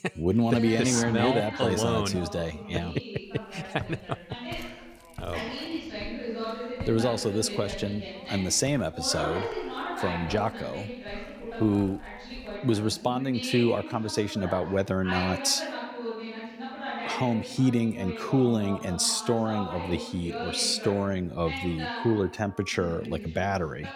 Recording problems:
background chatter; loud; throughout; 2 voices, 9 dB below the speech
footsteps; faint; from 4 to 13 s; peak 15 dB below the speech

